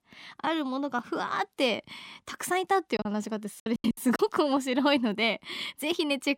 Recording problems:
choppy; very; from 3 to 4 s; 15% of the speech affected

